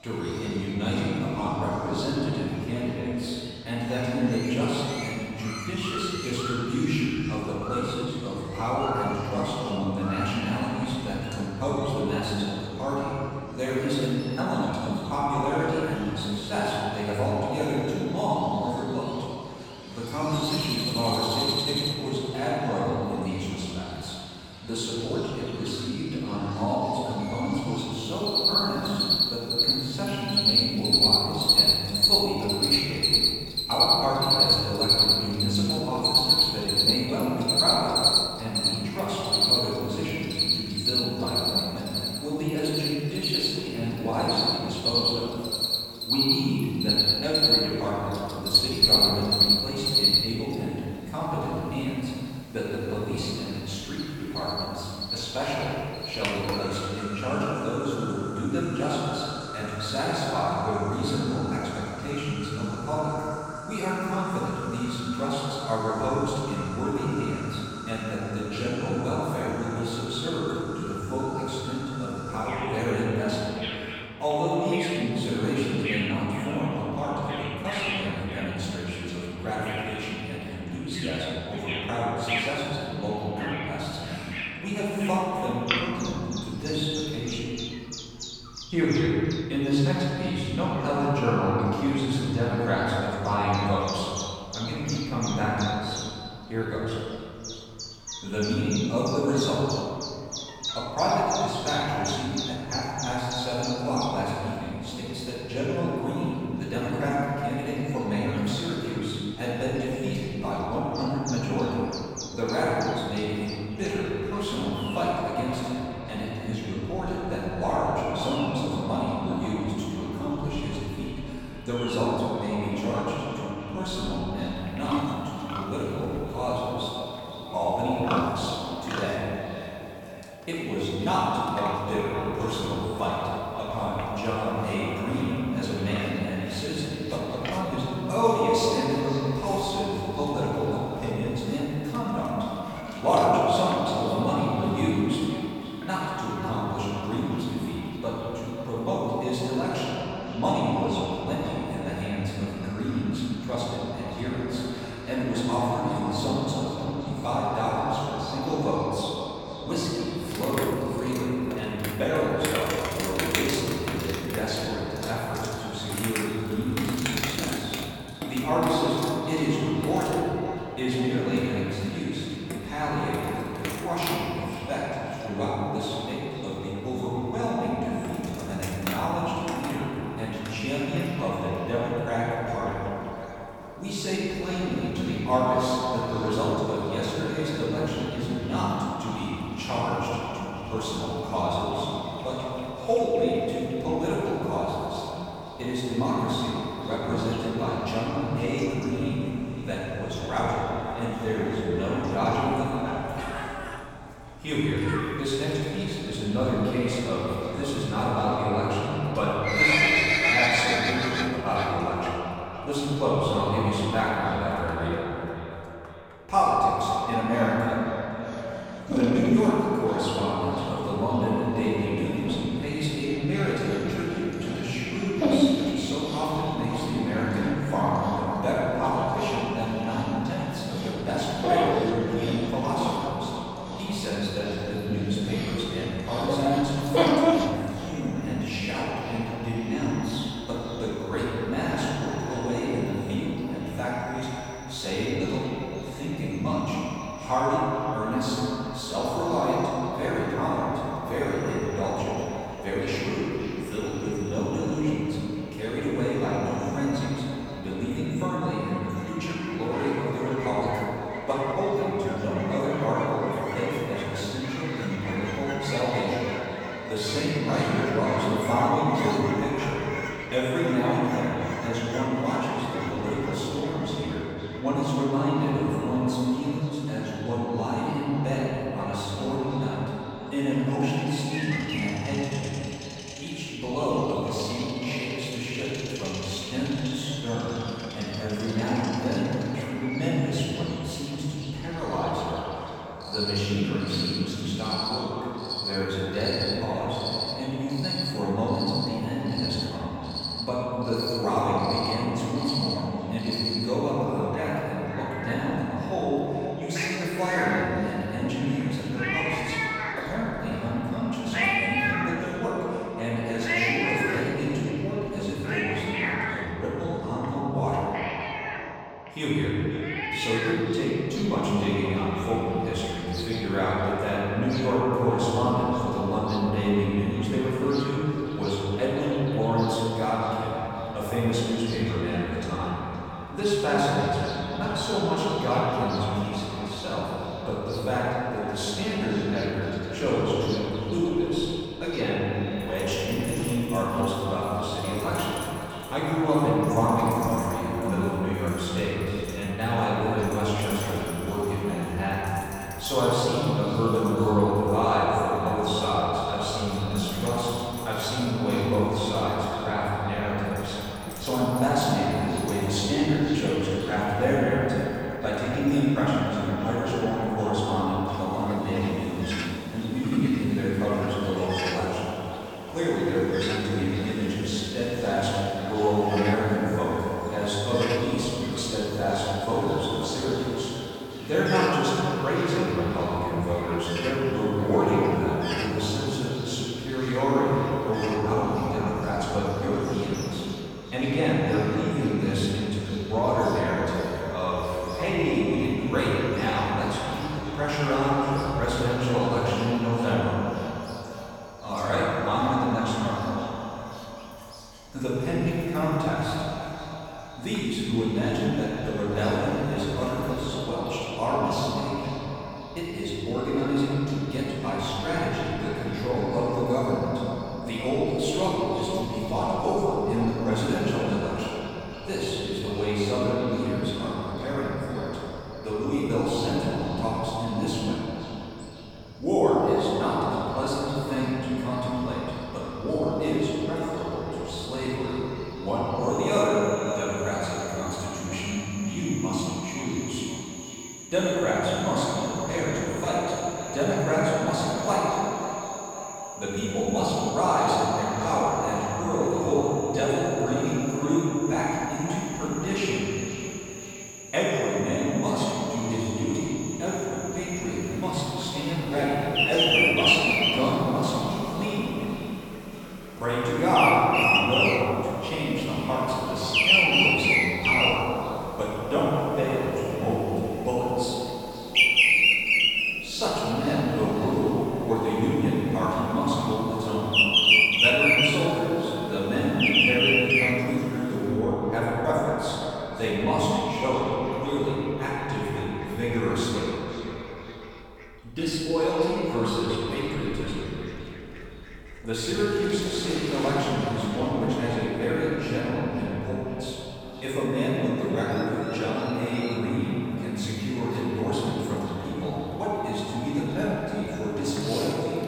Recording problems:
echo of what is said; strong; from 1:54 on; 520 ms later, 10 dB below the speech
room echo; strong; dies away in 2.4 s
off-mic speech; far
animal sounds; loud; throughout; as loud as the speech

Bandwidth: 17.5 kHz